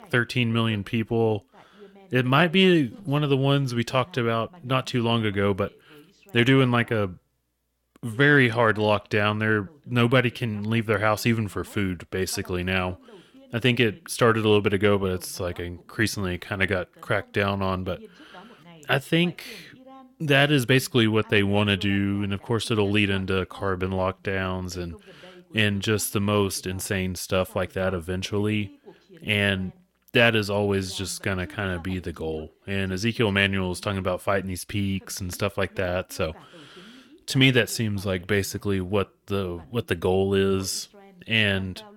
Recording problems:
voice in the background; faint; throughout; 25 dB below the speech

